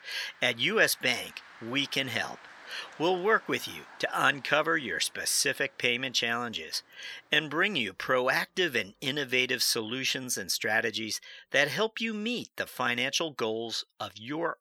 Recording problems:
thin; somewhat; fading below 1 kHz
traffic noise; faint; until 11 s; 25 dB below the speech

